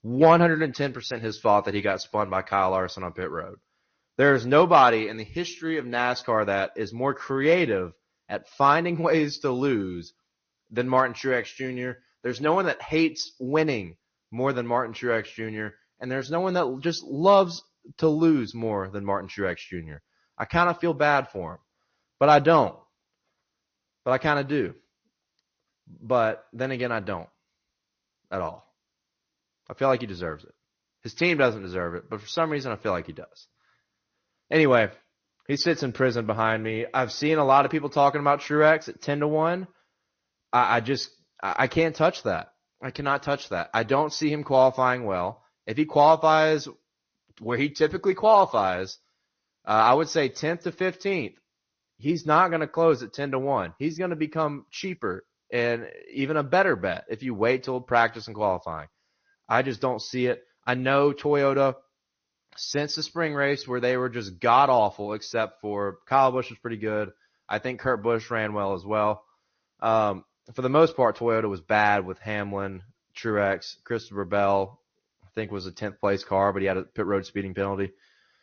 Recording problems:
high frequencies cut off; noticeable; nothing above 6.5 kHz
garbled, watery; slightly

